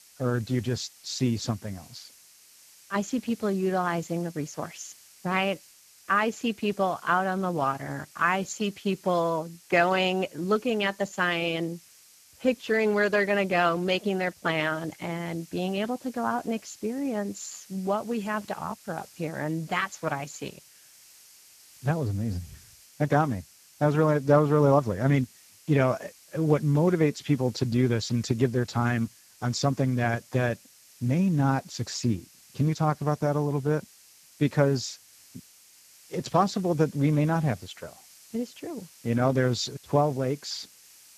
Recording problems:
garbled, watery; badly; nothing above 7.5 kHz
hiss; faint; throughout; 25 dB below the speech

